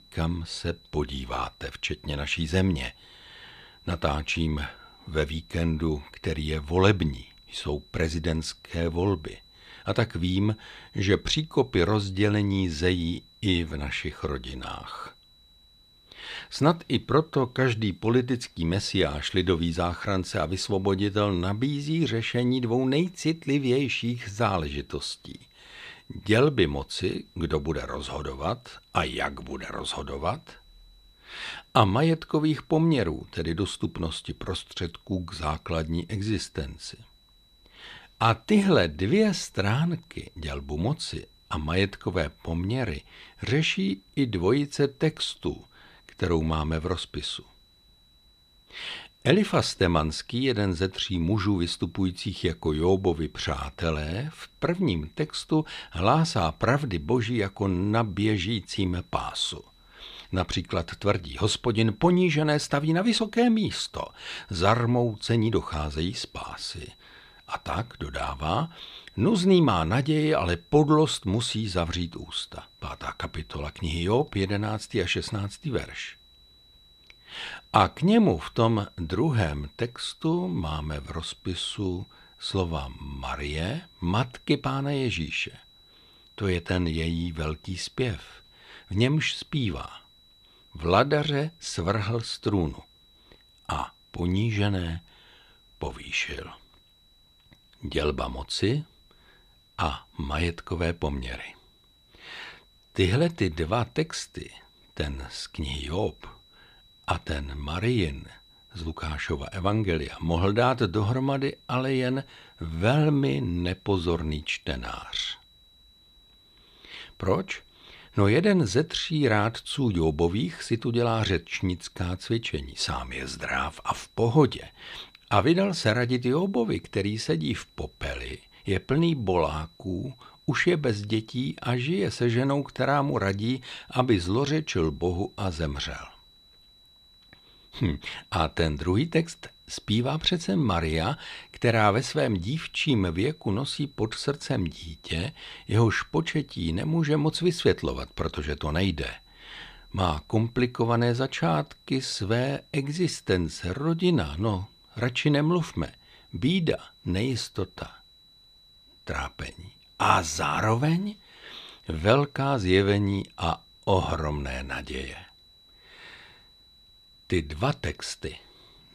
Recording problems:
high-pitched whine; faint; throughout; 4 kHz, 30 dB below the speech

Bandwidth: 14.5 kHz